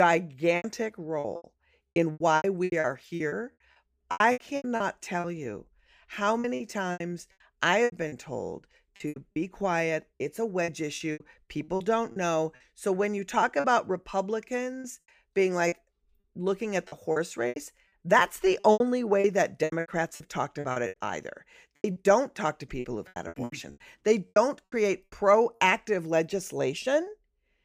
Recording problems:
choppy; very; 14% of the speech affected
abrupt cut into speech; at the start

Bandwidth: 15 kHz